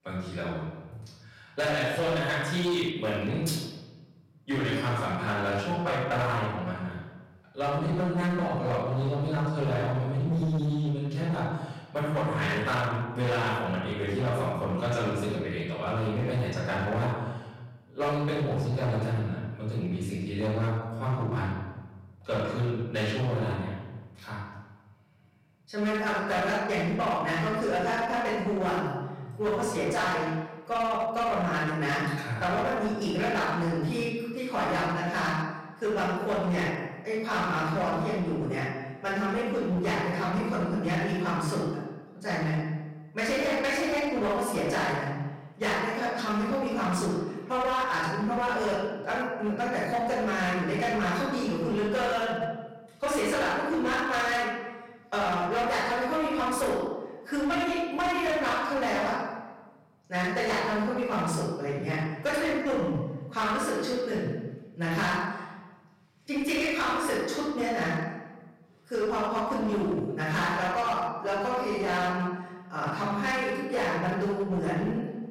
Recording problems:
off-mic speech; far
room echo; noticeable; dies away in 1.1 s
distortion; slight; 16% of the sound clipped

